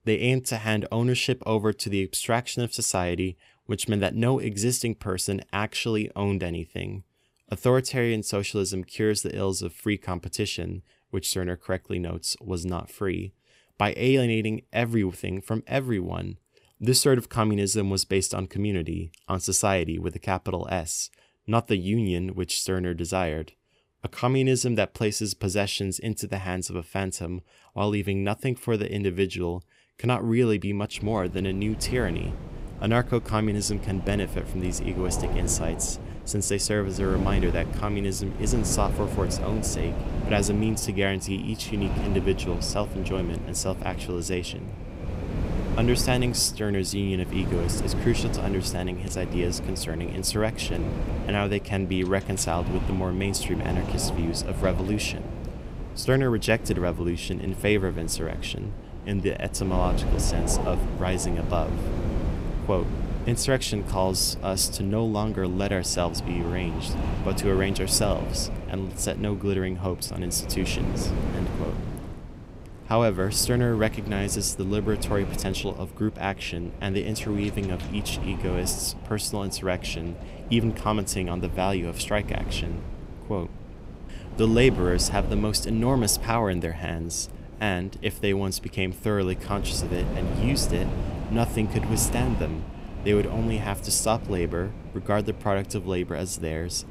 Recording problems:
wind noise on the microphone; occasional gusts; from 31 s on; 10 dB below the speech

